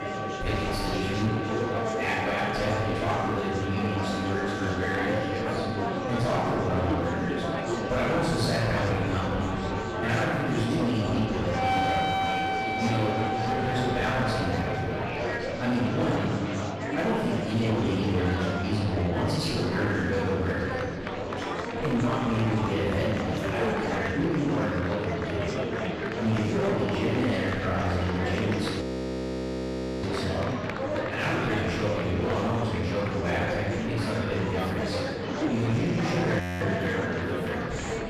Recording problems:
room echo; strong; dies away in 1.6 s
off-mic speech; far
distortion; slight; 15% of the sound clipped
background music; loud; throughout; 5 dB below the speech
murmuring crowd; loud; throughout; 3 dB below the speech
audio freezing; at 29 s for 1 s and at 36 s

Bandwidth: 14.5 kHz